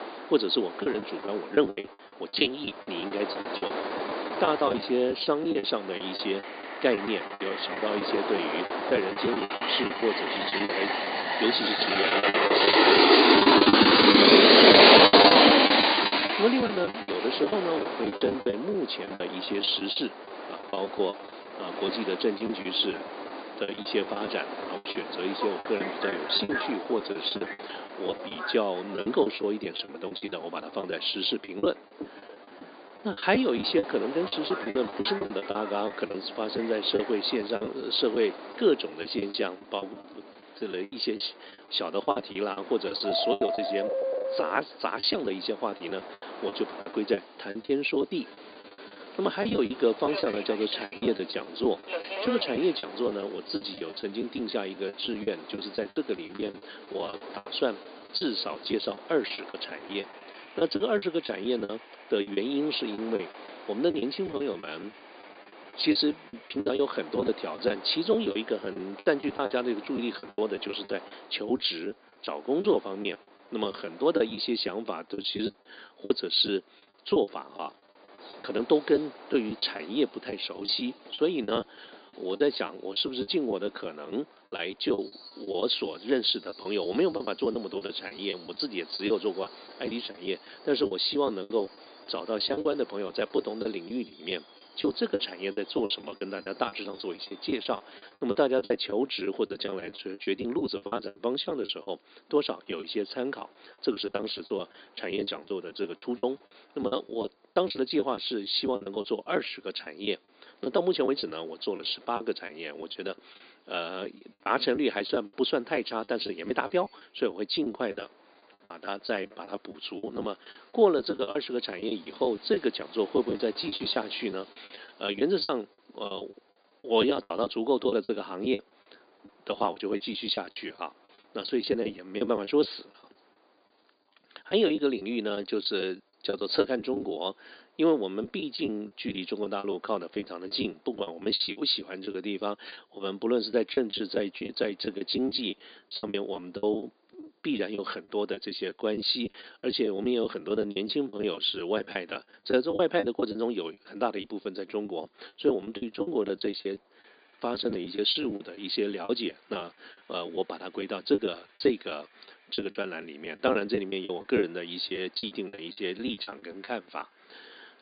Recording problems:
high frequencies cut off; severe; nothing above 5 kHz
thin; somewhat; fading below 250 Hz
train or aircraft noise; very loud; throughout; 6 dB above the speech
choppy; very; 15% of the speech affected

